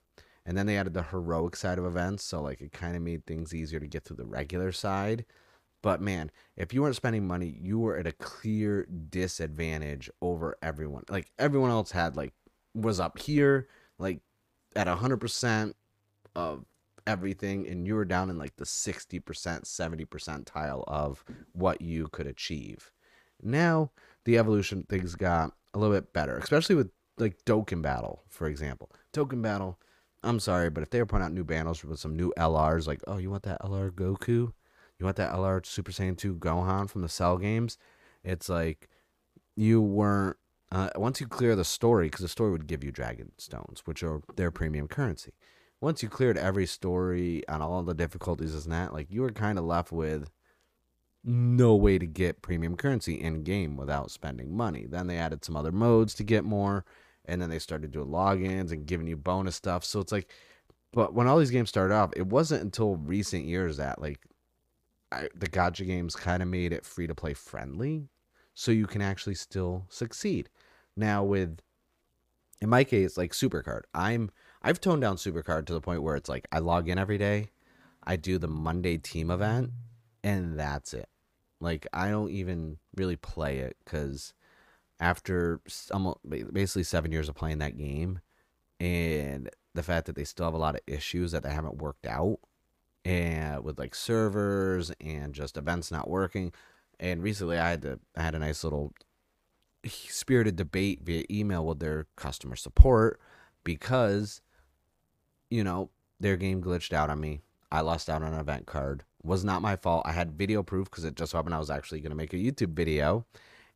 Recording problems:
none

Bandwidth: 15 kHz